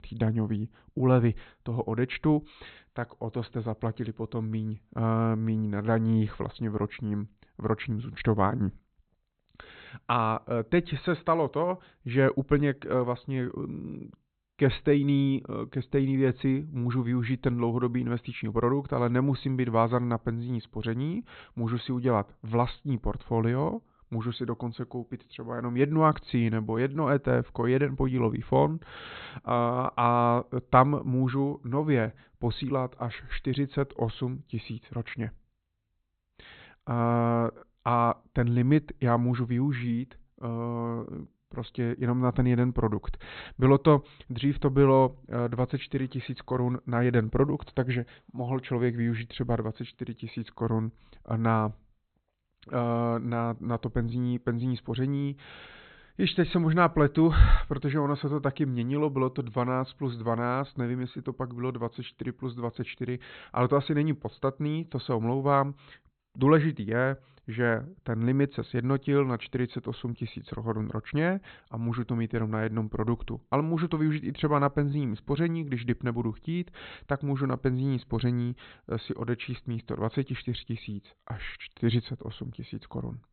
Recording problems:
high frequencies cut off; severe; nothing above 4 kHz

